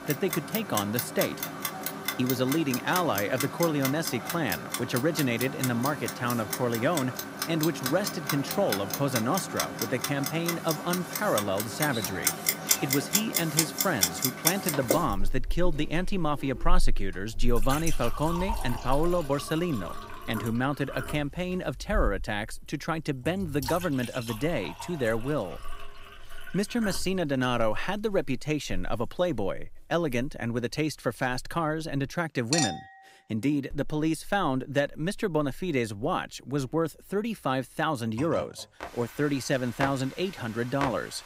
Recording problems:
household noises; loud; throughout; 3 dB below the speech

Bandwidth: 15.5 kHz